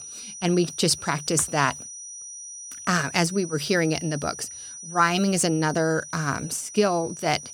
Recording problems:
high-pitched whine; noticeable; throughout; 6 kHz, 10 dB below the speech

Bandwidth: 18 kHz